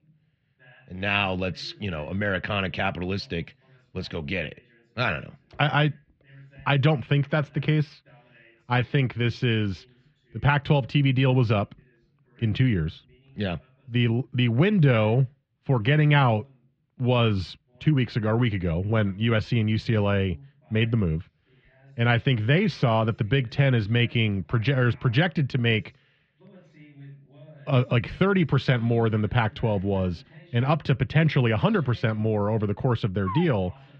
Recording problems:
muffled; slightly; fading above 3.5 kHz
voice in the background; faint; throughout; 30 dB below the speech

